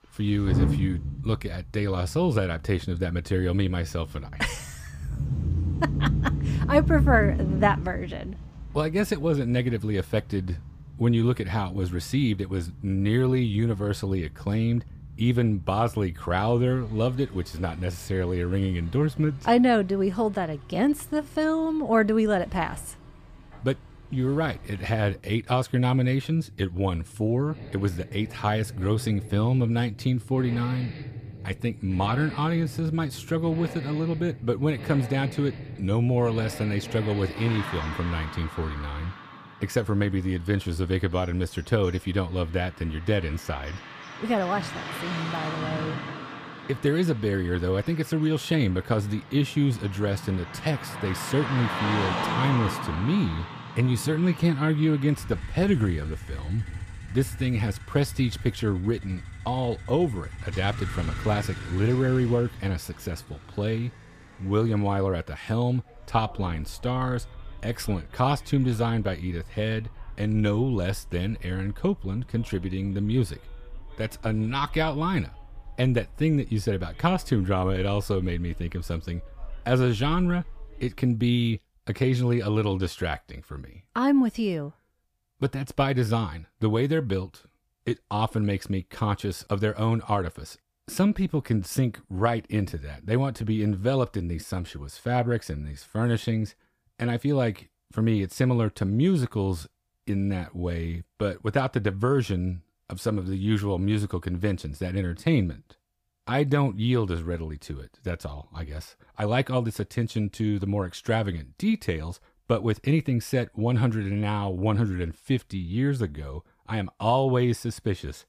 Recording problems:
traffic noise; loud; until 1:21; 9 dB below the speech

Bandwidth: 15 kHz